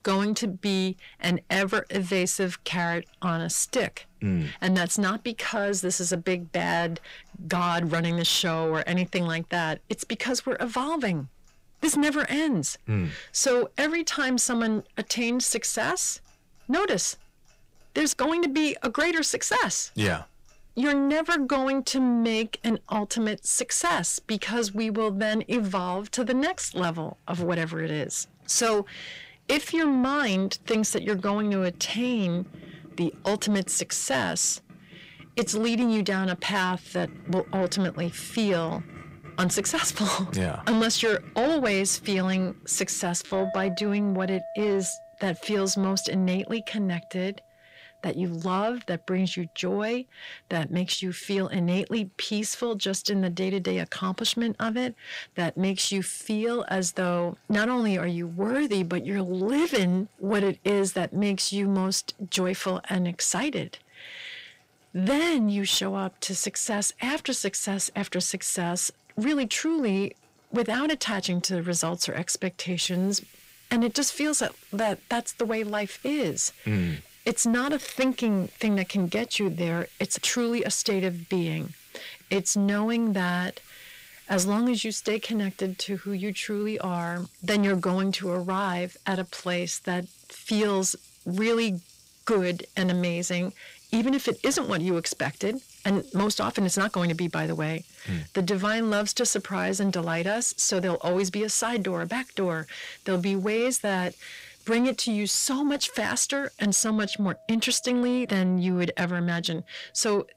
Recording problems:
distortion; slight; 10 dB below the speech
household noises; faint; throughout; 20 dB below the speech

